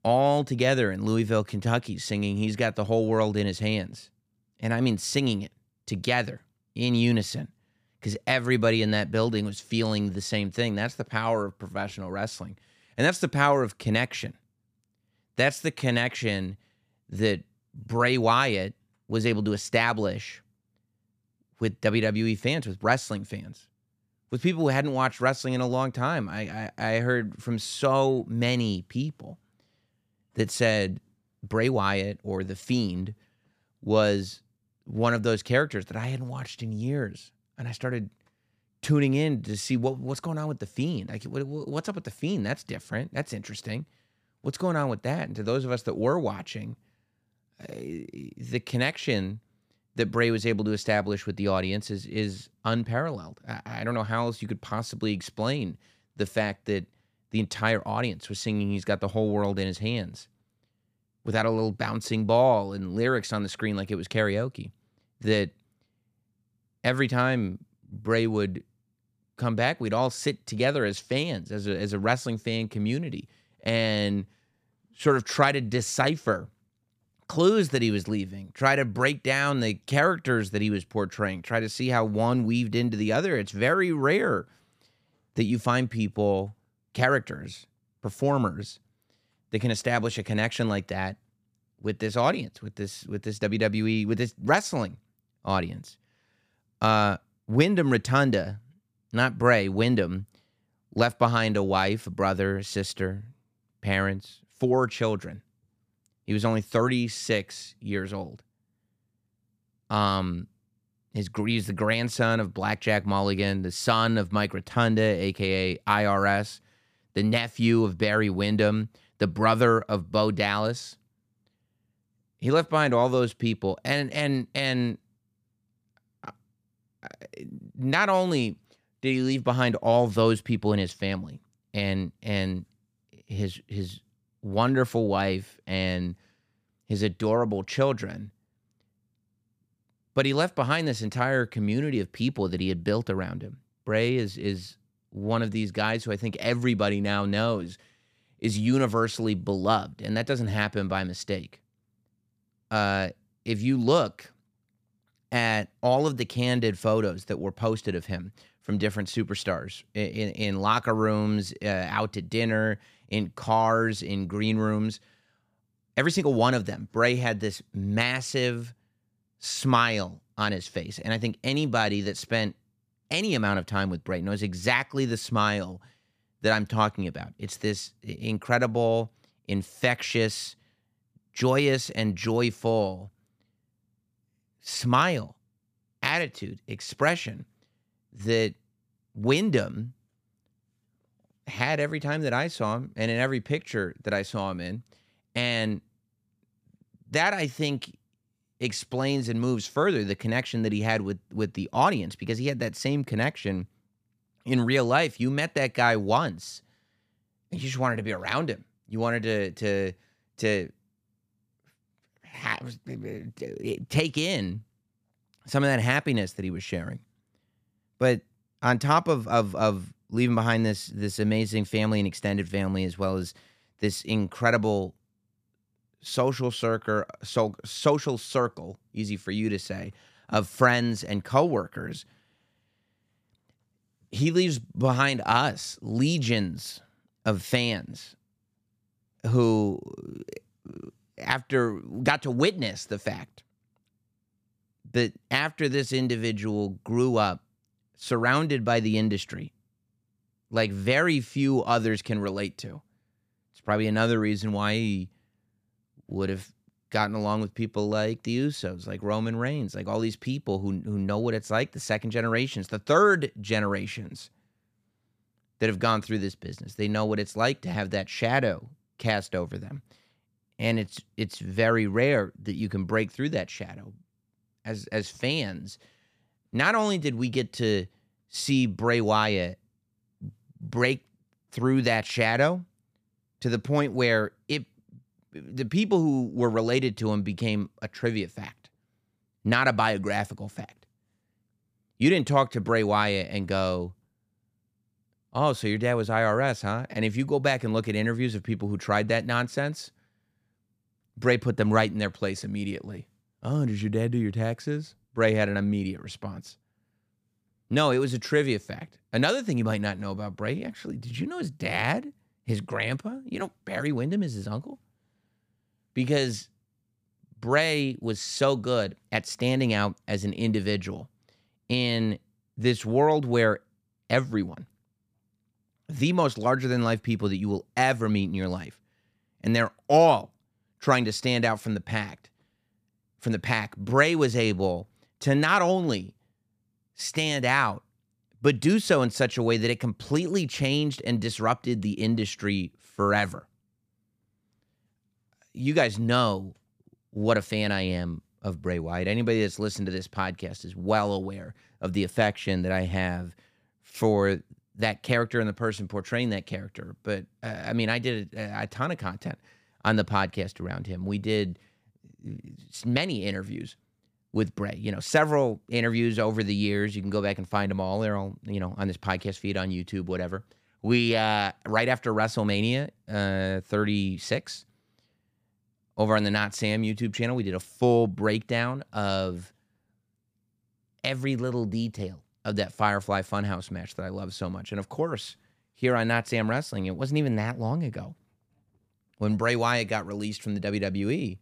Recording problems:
none

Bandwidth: 15 kHz